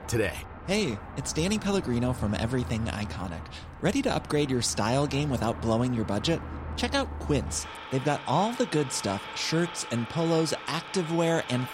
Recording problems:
traffic noise; noticeable; throughout; 10 dB below the speech

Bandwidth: 16 kHz